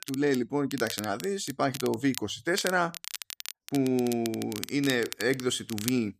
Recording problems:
crackle, like an old record; noticeable; 10 dB below the speech

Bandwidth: 14.5 kHz